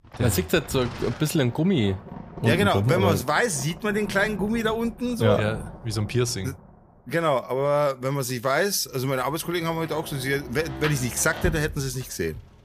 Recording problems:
rain or running water; noticeable; throughout; 15 dB below the speech

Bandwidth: 14.5 kHz